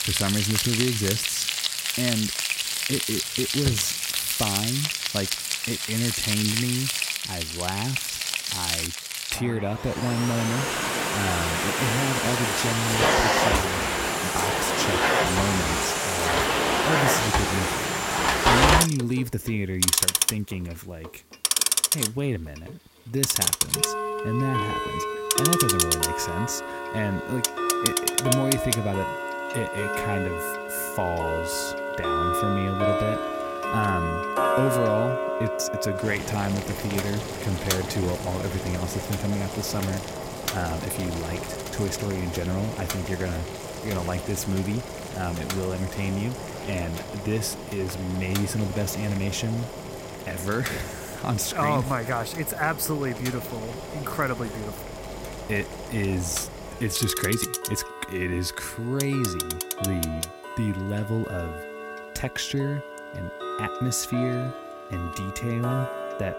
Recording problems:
household noises; very loud; throughout; 3 dB above the speech

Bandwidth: 16 kHz